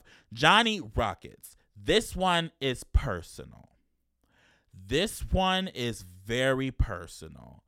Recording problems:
none

